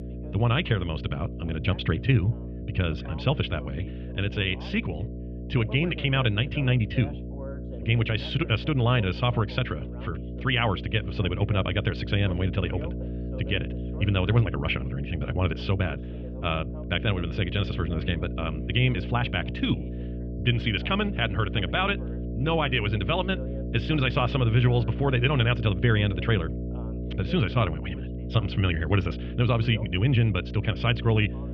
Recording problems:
muffled; very; fading above 3 kHz
wrong speed, natural pitch; too fast; 1.5 times normal speed
electrical hum; noticeable; throughout; 60 Hz, 15 dB below the speech
voice in the background; faint; throughout; 20 dB below the speech

